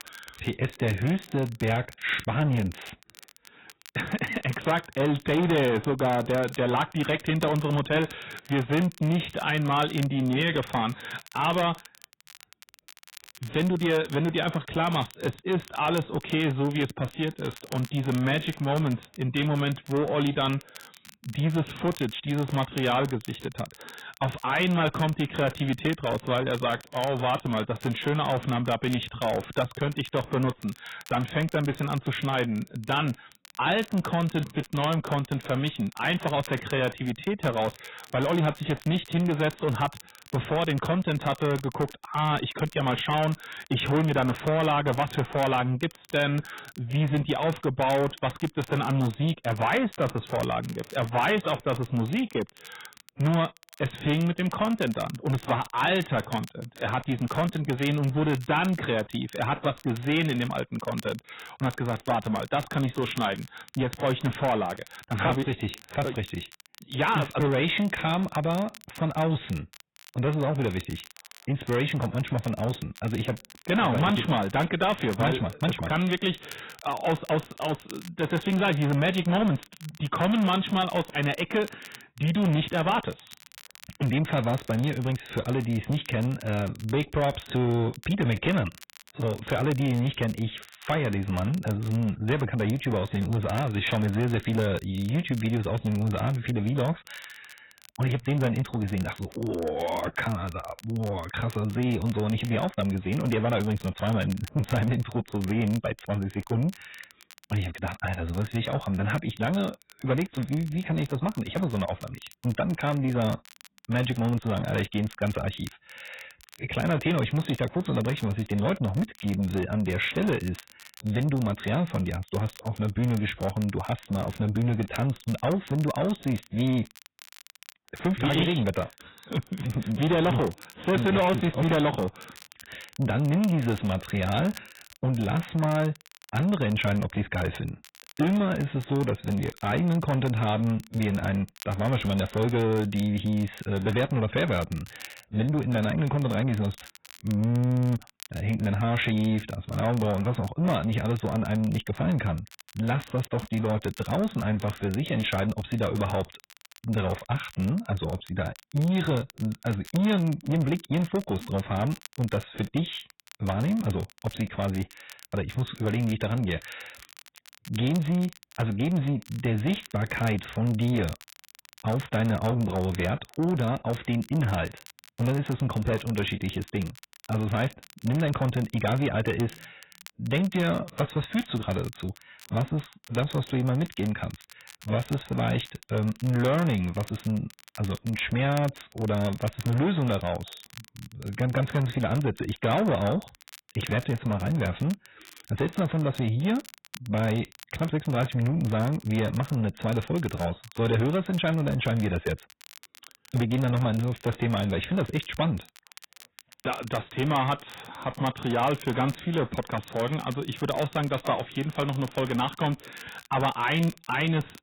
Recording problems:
garbled, watery; badly; nothing above 4 kHz
distortion; slight; 10 dB below the speech
crackle, like an old record; faint; 20 dB below the speech

